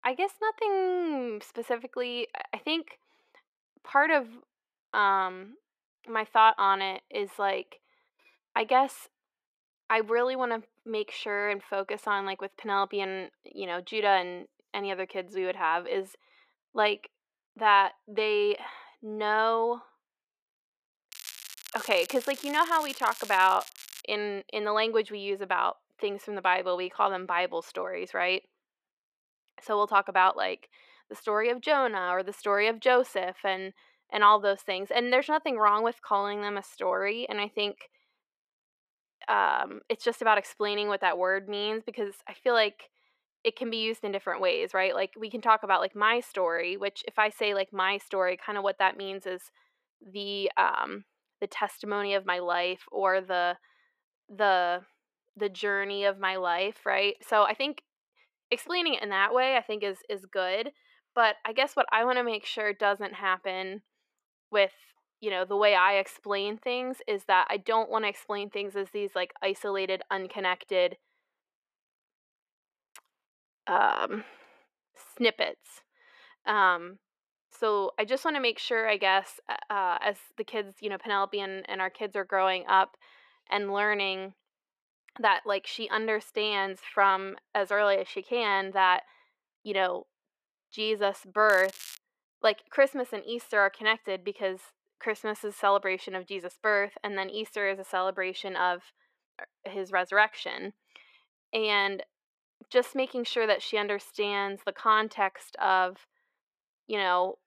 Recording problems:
muffled; slightly; fading above 4 kHz
thin; somewhat; fading below 500 Hz
crackling; noticeable; from 21 to 24 s and at 1:31; 15 dB below the speech

